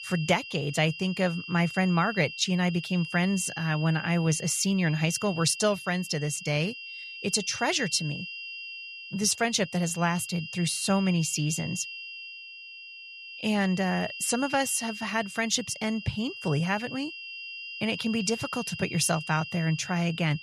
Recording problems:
high-pitched whine; noticeable; throughout; 2.5 kHz, 10 dB below the speech

